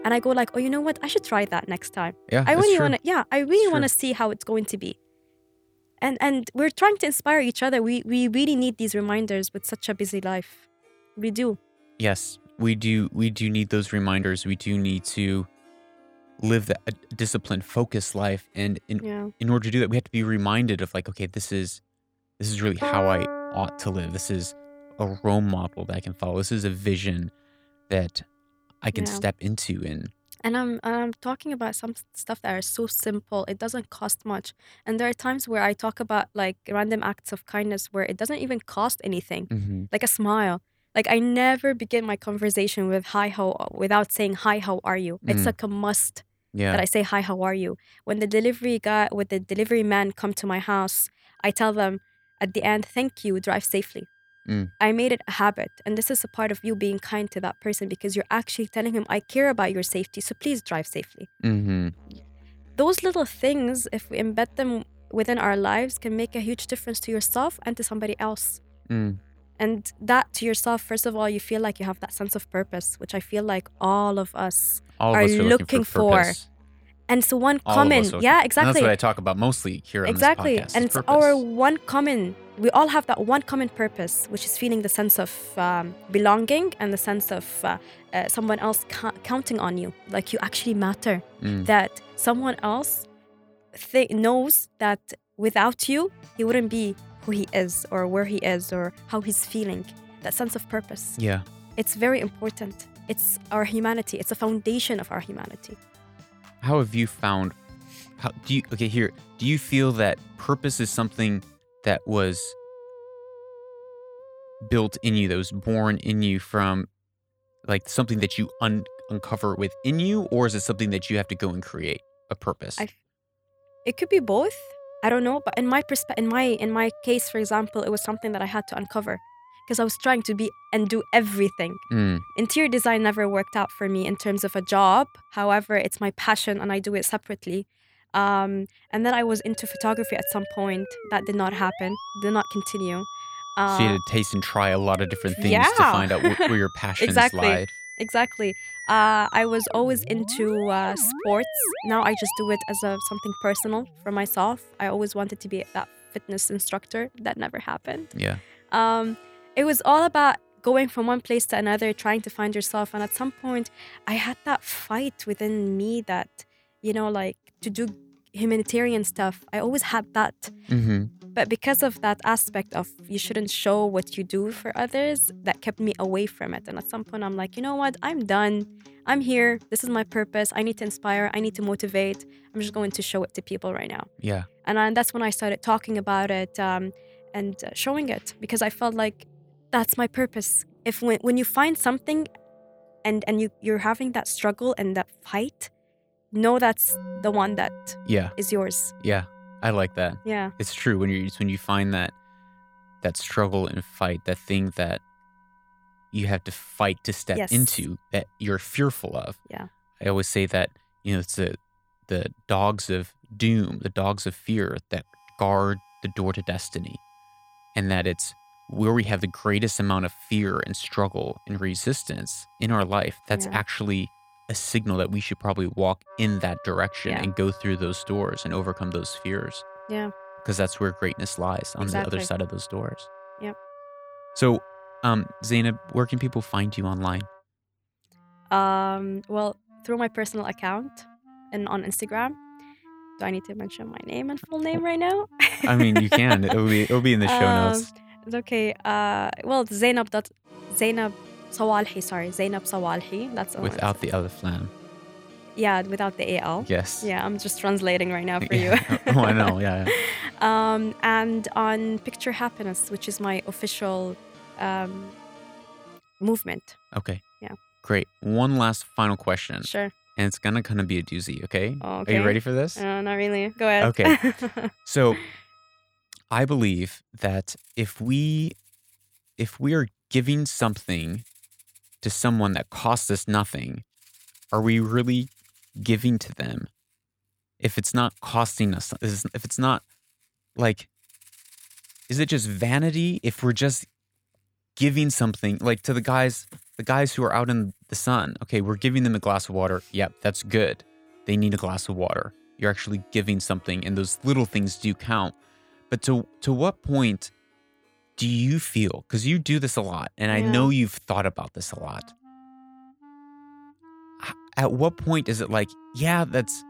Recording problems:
background music; noticeable; throughout; 20 dB below the speech

